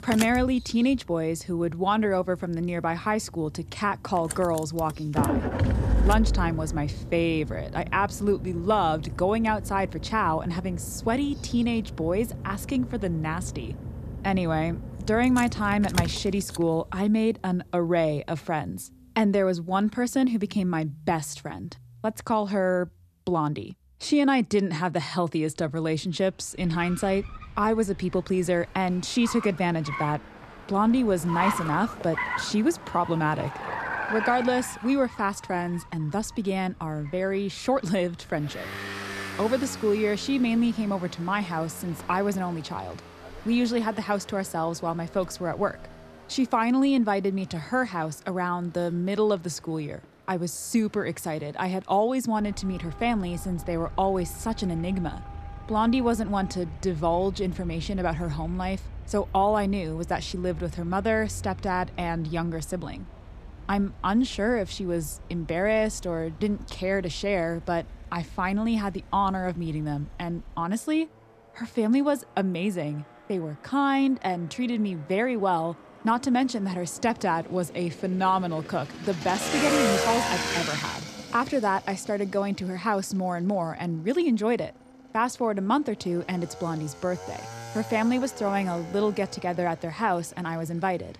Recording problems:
traffic noise; loud; throughout; 8 dB below the speech

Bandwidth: 14 kHz